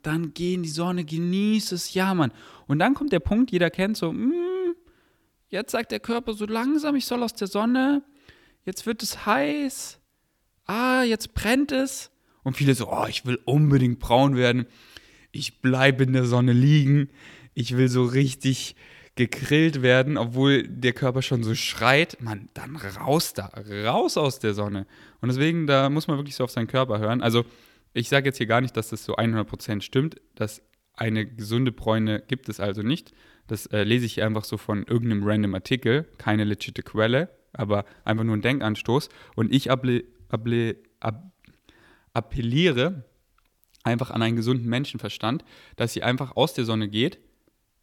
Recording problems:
none

